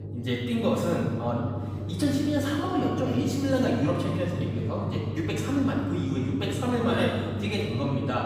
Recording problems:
off-mic speech; far
room echo; noticeable; dies away in 1.6 s
low rumble; noticeable; throughout; 15 dB below the speech
chatter from many people; faint; throughout; 25 dB below the speech

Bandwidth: 15.5 kHz